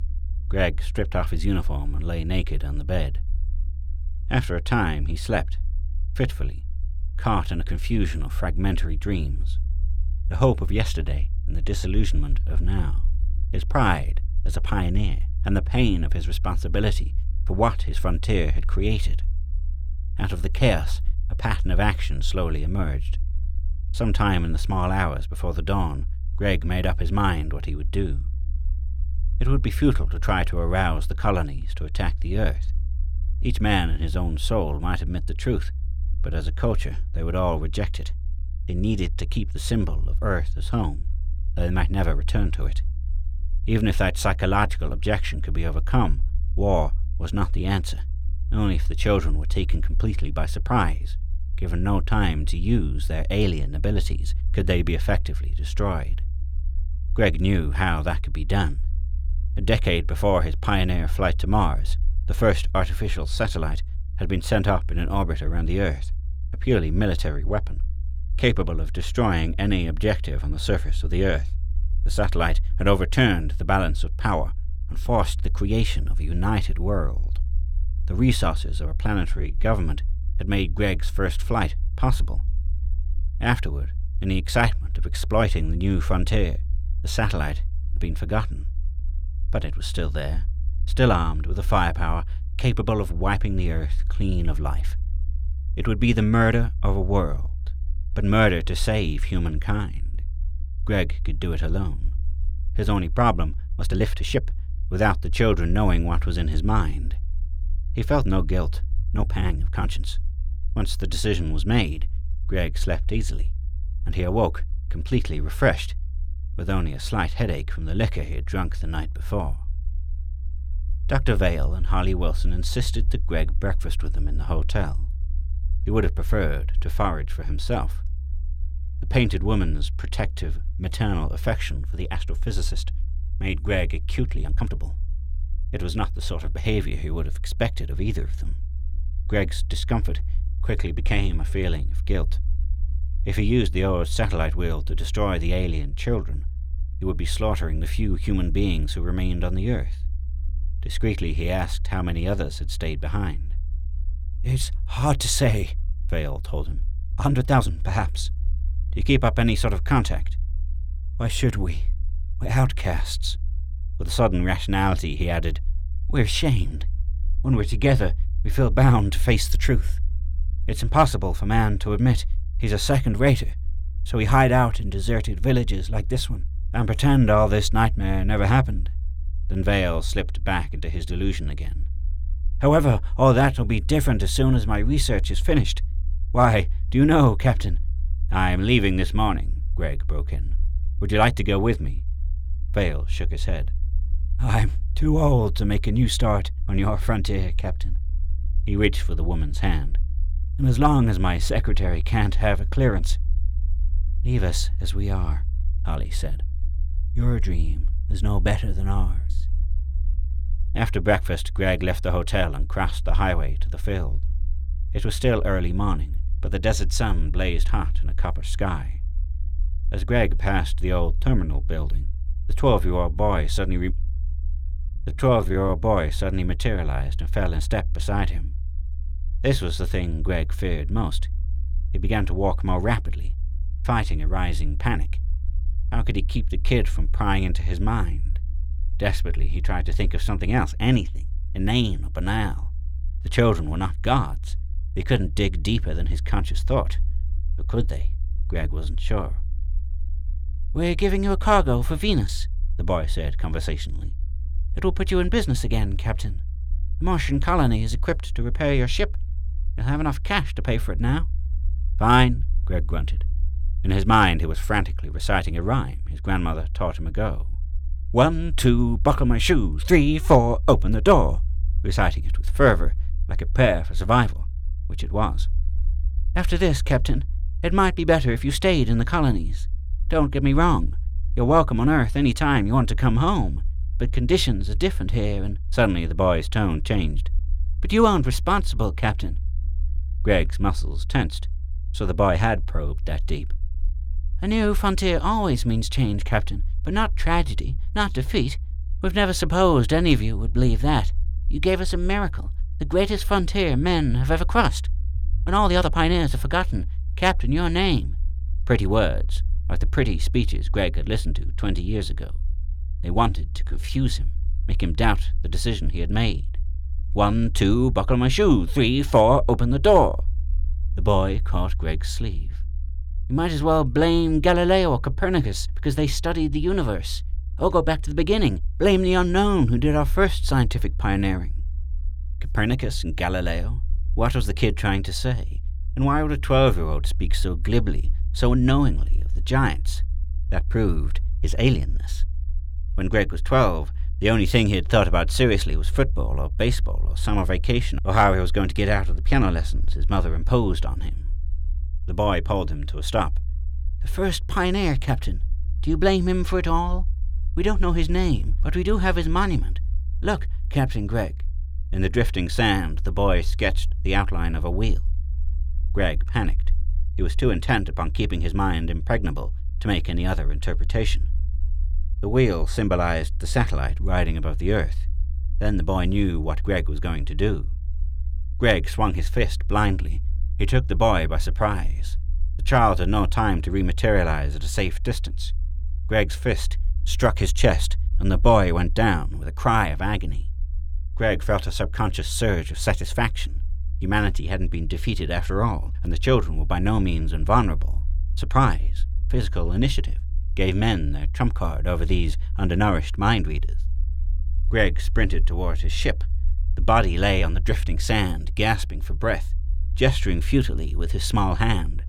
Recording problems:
low rumble; faint; throughout; 25 dB below the speech
uneven, jittery; strongly; from 1:19 to 6:48

